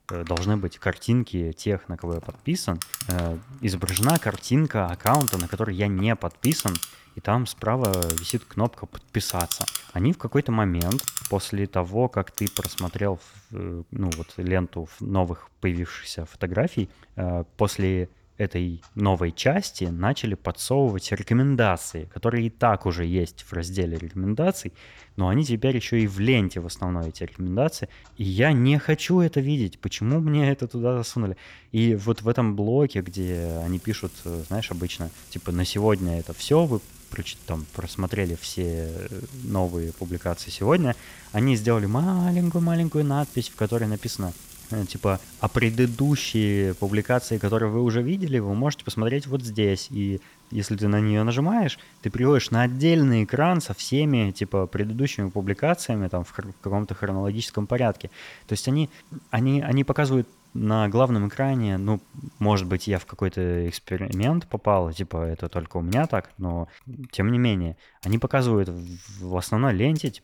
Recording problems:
household noises; noticeable; throughout; 10 dB below the speech

